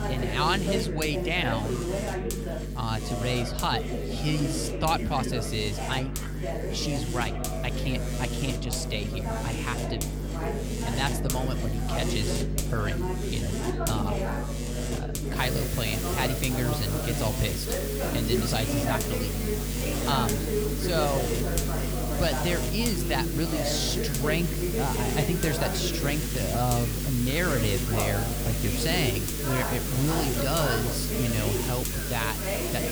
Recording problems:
electrical hum; loud; throughout; 50 Hz, 7 dB below the speech
chatter from many people; loud; throughout; 4 dB below the speech
hiss; loud; from 15 s on; 4 dB below the speech

